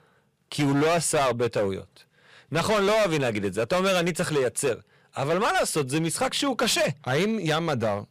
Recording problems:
distortion; heavy; 15% of the sound clipped

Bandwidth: 15 kHz